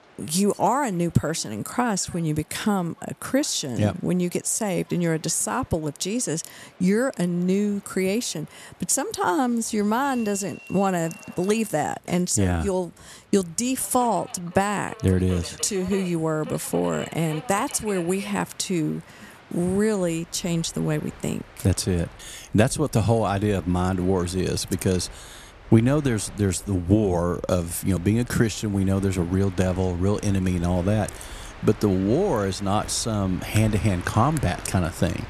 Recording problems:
train or aircraft noise; noticeable; throughout; 20 dB below the speech

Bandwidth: 13.5 kHz